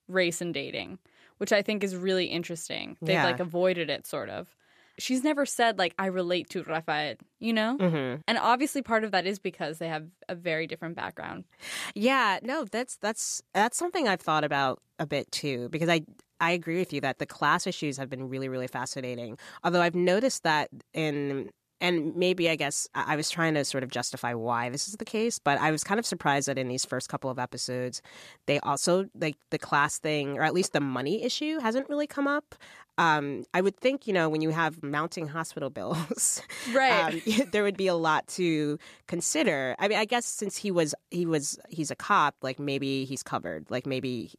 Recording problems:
none

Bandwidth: 14.5 kHz